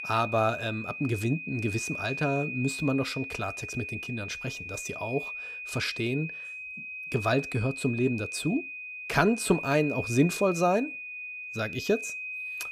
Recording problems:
high-pitched whine; loud; throughout; 2.5 kHz, 6 dB below the speech

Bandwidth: 15.5 kHz